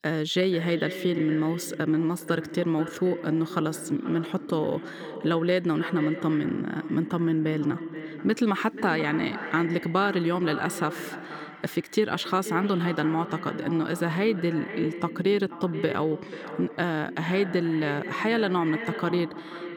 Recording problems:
echo of what is said; strong; throughout; 480 ms later, 10 dB below the speech

